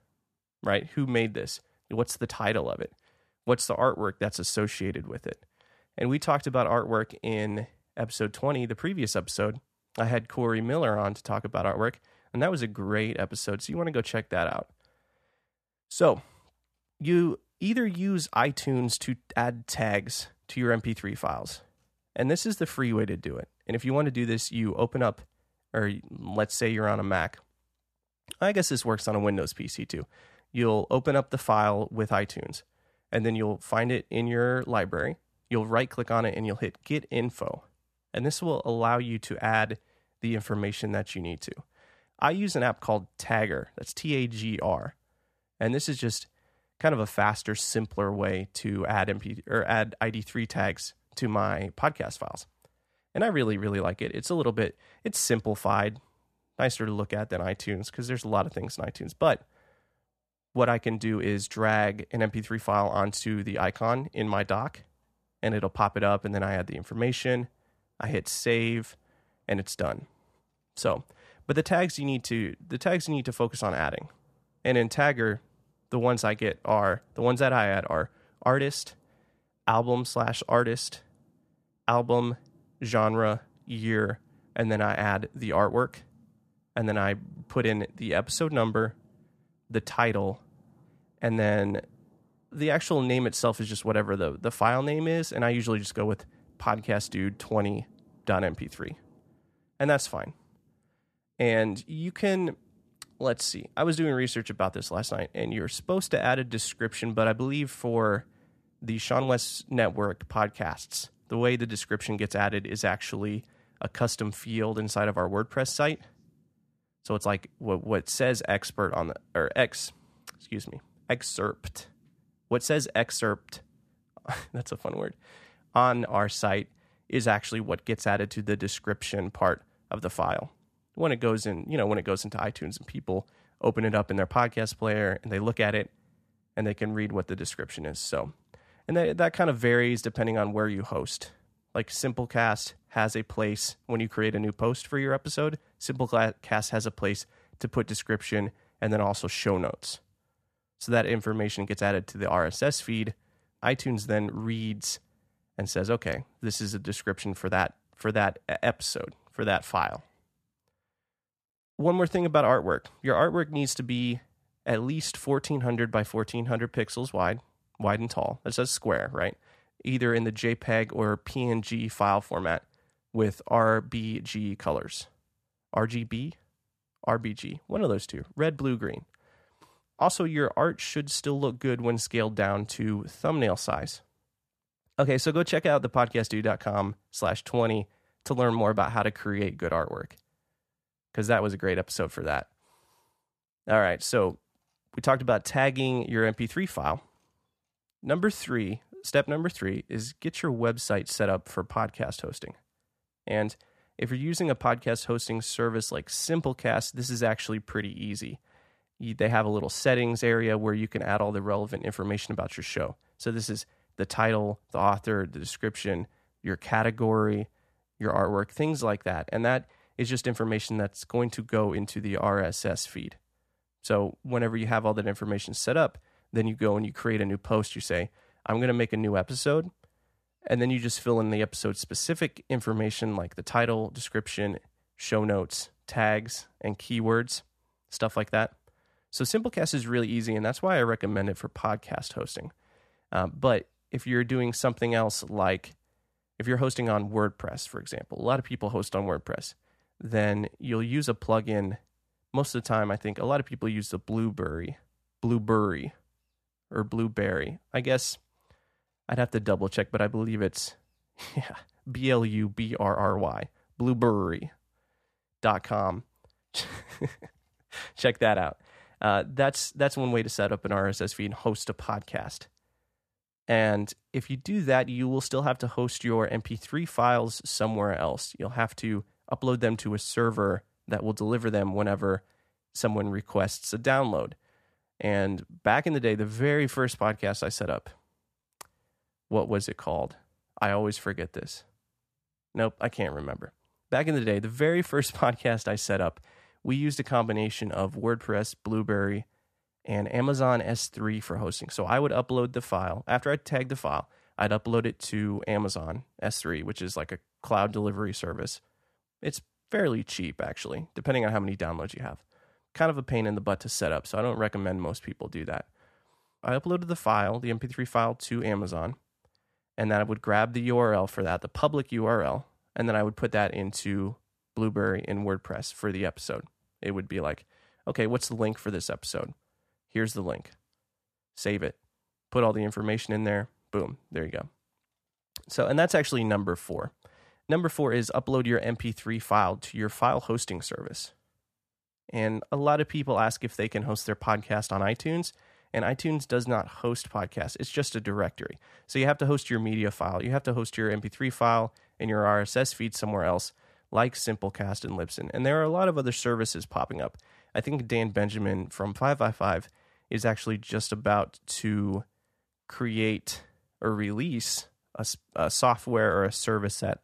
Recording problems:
none

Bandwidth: 14.5 kHz